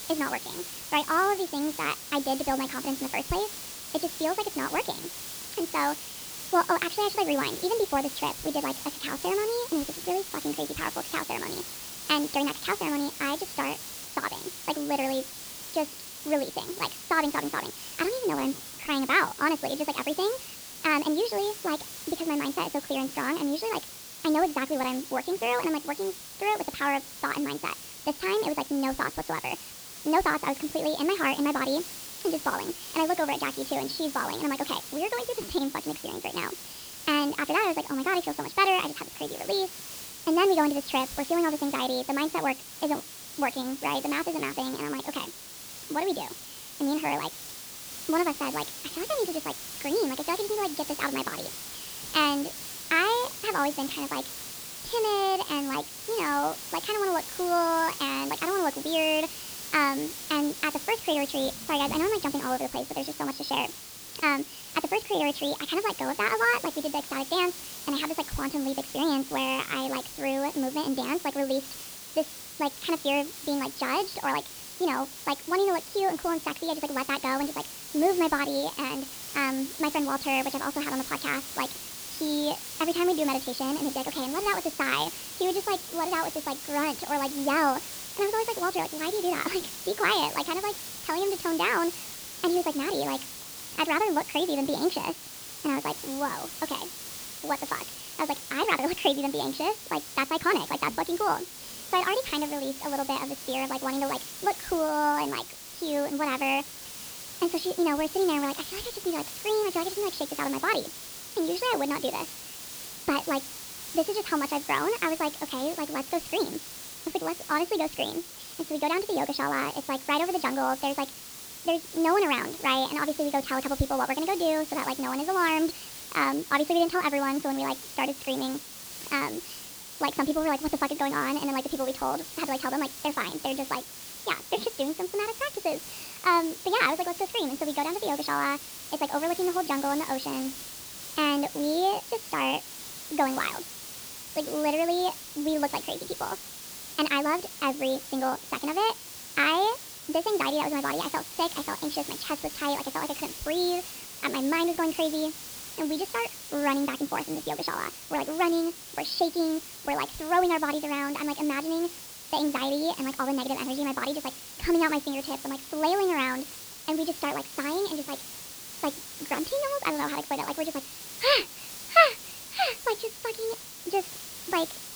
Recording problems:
wrong speed and pitch; too fast and too high; 1.5 times normal speed
high frequencies cut off; noticeable; nothing above 5.5 kHz
hiss; loud; throughout; 9 dB below the speech

